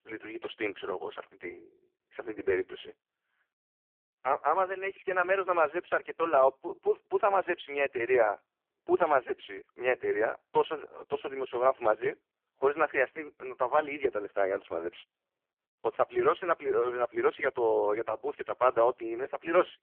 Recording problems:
phone-call audio; poor line; nothing above 3.5 kHz

